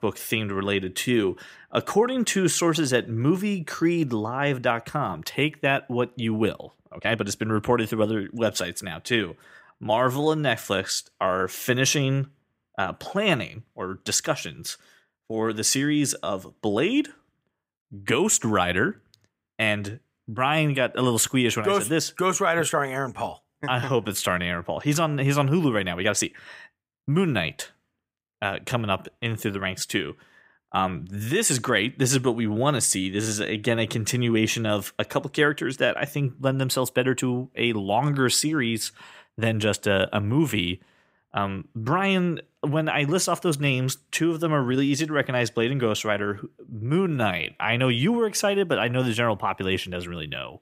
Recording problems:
uneven, jittery; strongly; from 7 to 48 s

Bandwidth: 15.5 kHz